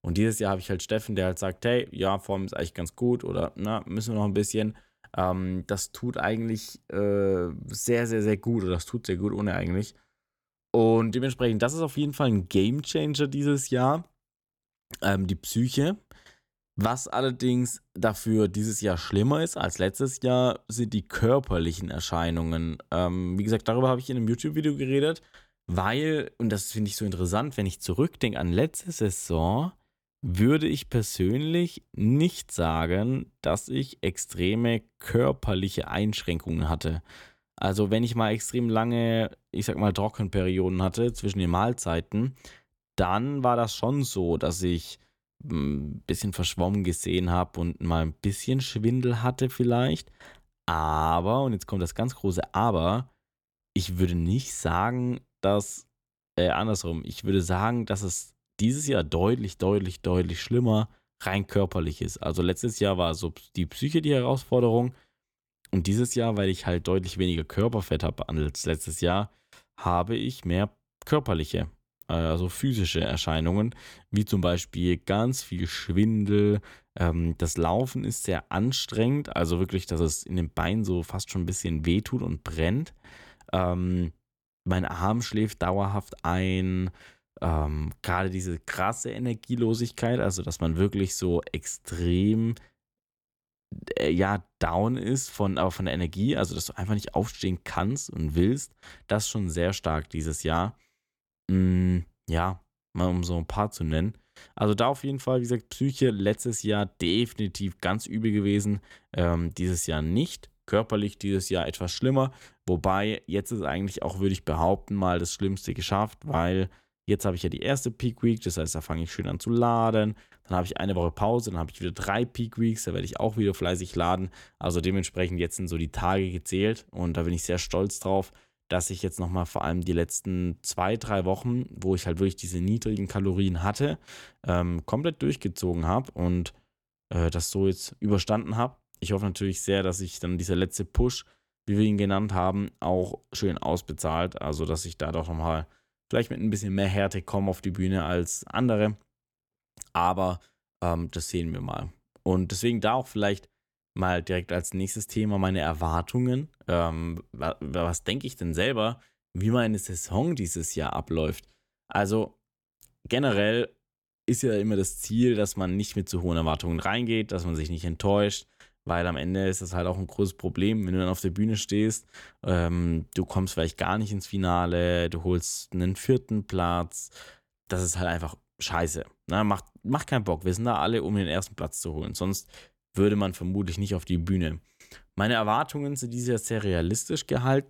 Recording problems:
none

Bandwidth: 17.5 kHz